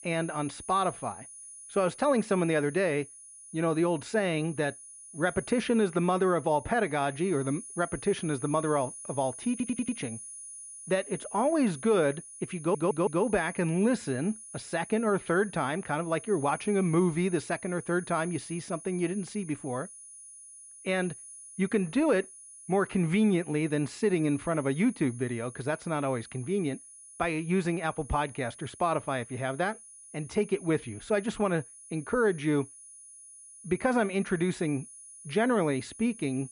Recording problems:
muffled; very; fading above 2.5 kHz
high-pitched whine; noticeable; throughout; 10 kHz, 15 dB below the speech
audio stuttering; at 9.5 s and at 13 s

